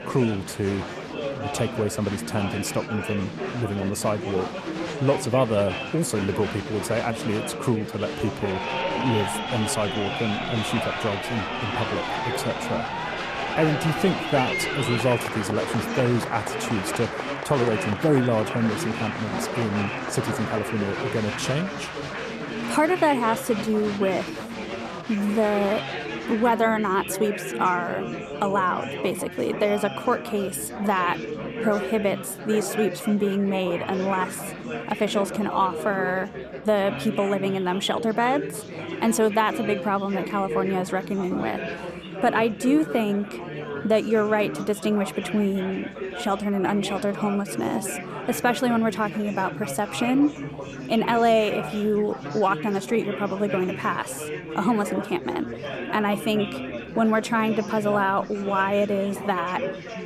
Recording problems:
chatter from many people; loud; throughout; 6 dB below the speech

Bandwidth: 14 kHz